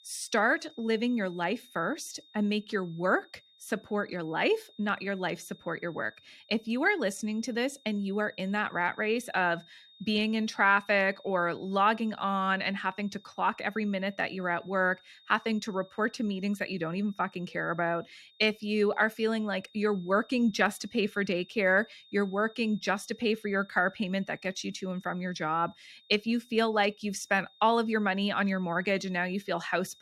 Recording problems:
high-pitched whine; faint; throughout; 3.5 kHz, 25 dB below the speech

